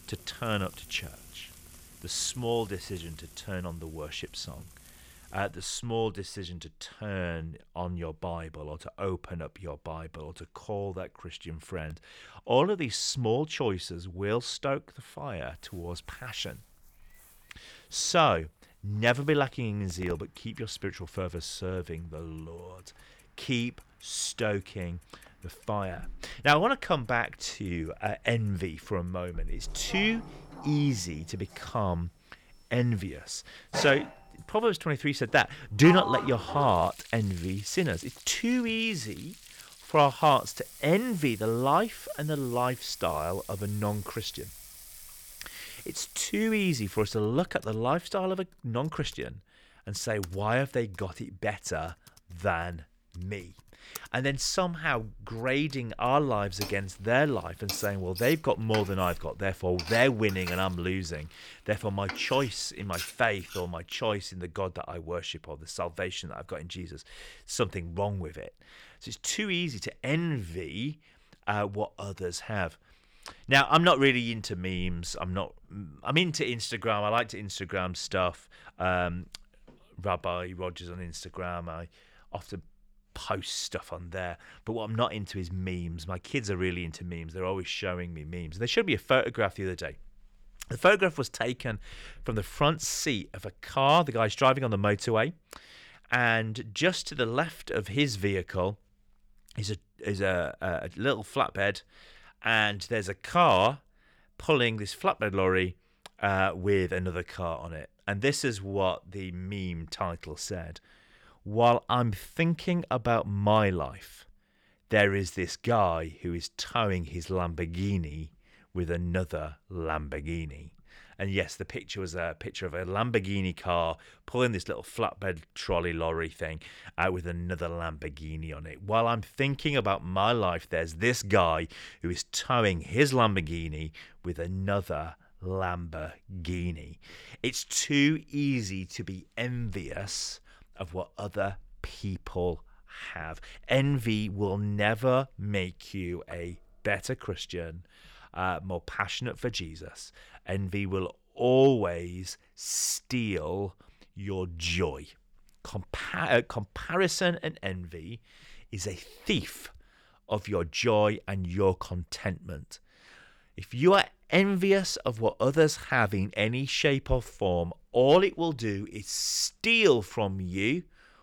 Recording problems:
household noises; noticeable; until 1:04; 15 dB below the speech

